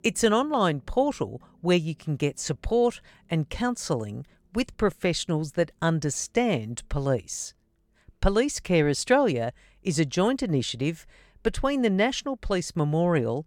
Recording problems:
none

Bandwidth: 17 kHz